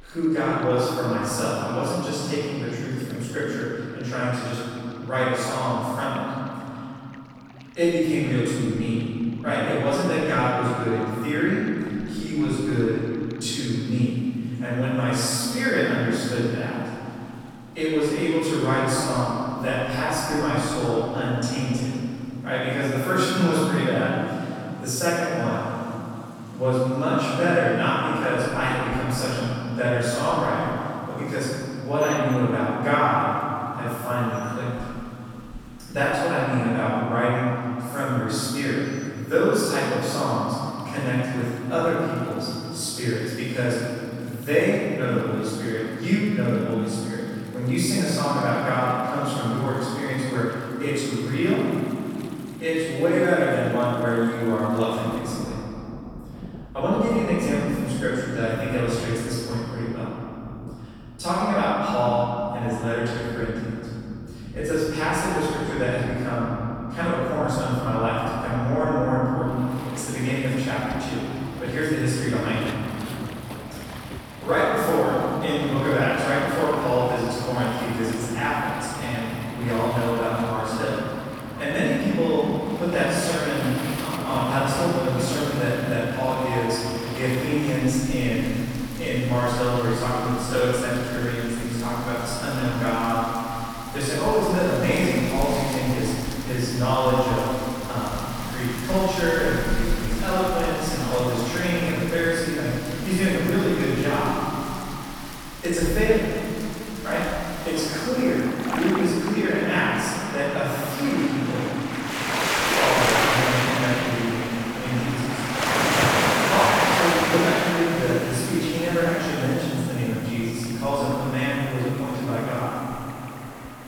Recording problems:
room echo; strong; dies away in 3 s
off-mic speech; far
rain or running water; loud; throughout; 6 dB below the speech

